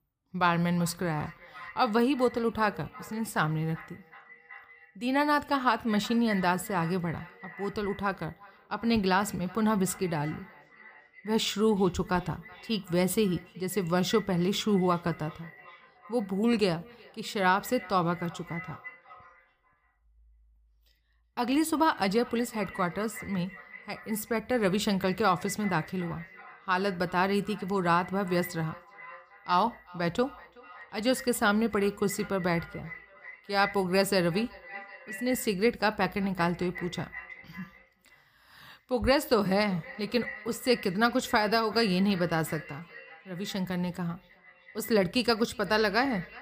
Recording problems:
echo of what is said; noticeable; throughout; 370 ms later, 15 dB below the speech

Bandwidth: 15 kHz